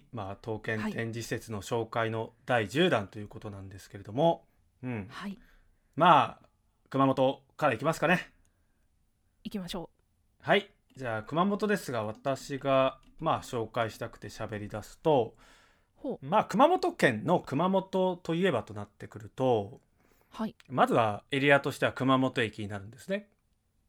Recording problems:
uneven, jittery; strongly; from 4 to 21 s

